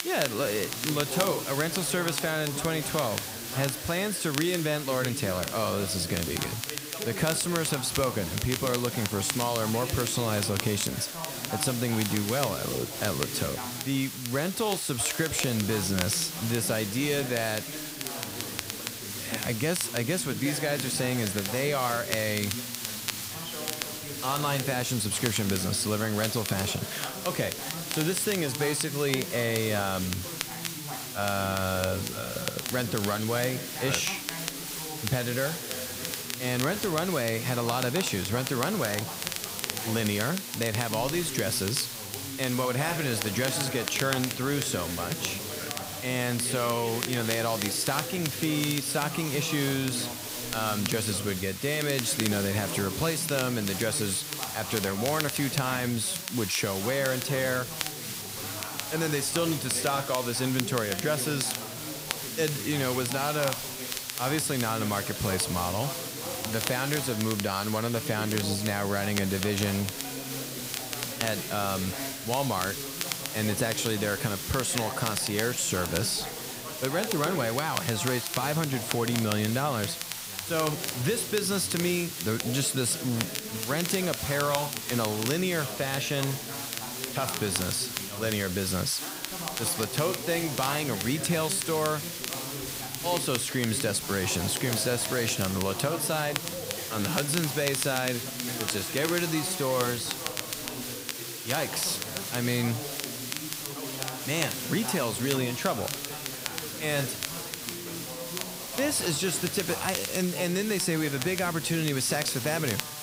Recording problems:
hiss; loud; throughout; 6 dB below the speech
crackle, like an old record; loud; 8 dB below the speech
background chatter; noticeable; throughout; 3 voices, 10 dB below the speech

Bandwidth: 15.5 kHz